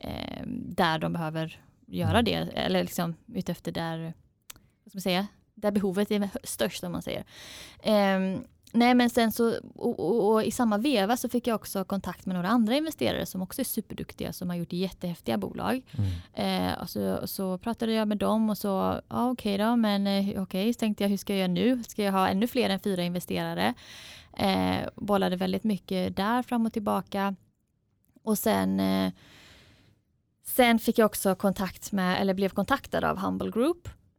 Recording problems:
none

